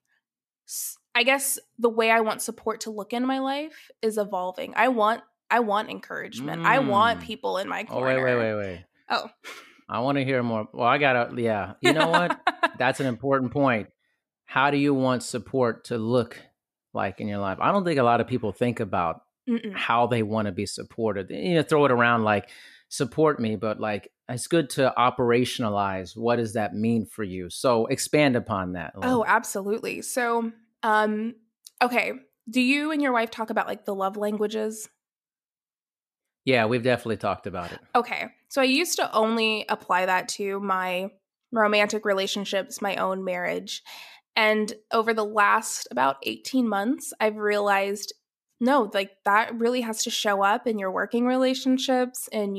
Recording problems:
abrupt cut into speech; at the end

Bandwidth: 14.5 kHz